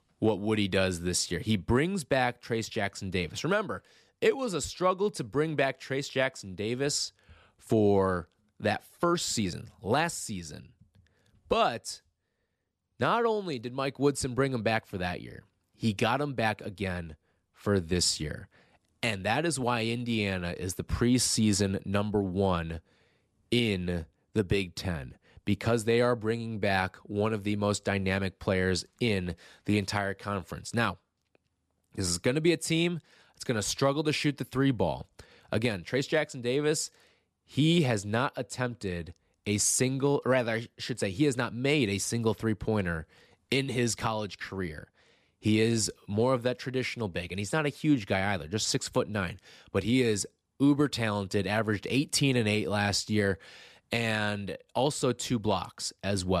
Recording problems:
abrupt cut into speech; at the end

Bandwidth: 14.5 kHz